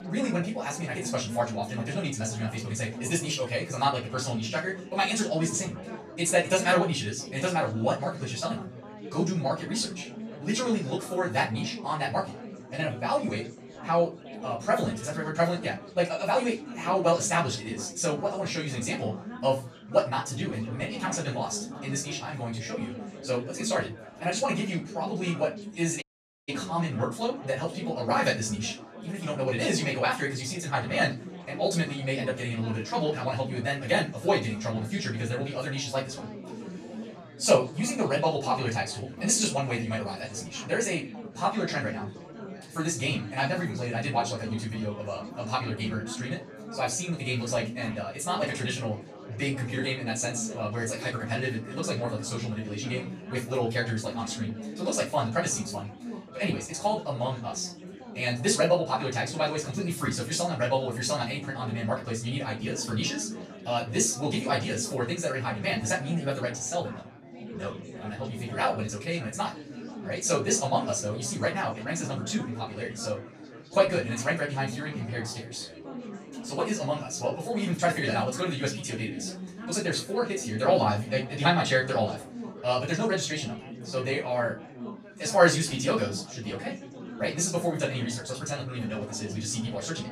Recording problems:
off-mic speech; far
wrong speed, natural pitch; too fast; 1.5 times normal speed
room echo; slight; dies away in 0.2 s
chatter from many people; noticeable; throughout; 10 dB below the speech
audio cutting out; at 26 s

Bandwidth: 14.5 kHz